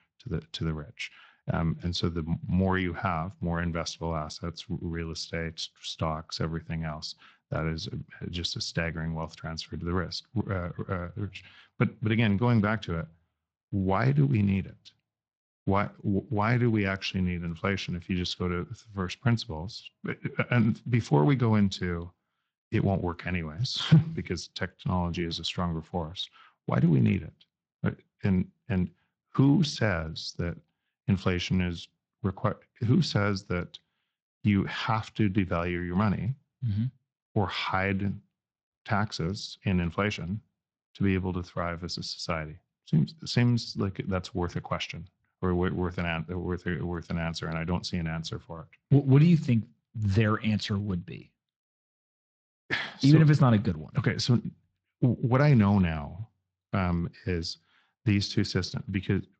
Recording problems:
garbled, watery; slightly; nothing above 7.5 kHz

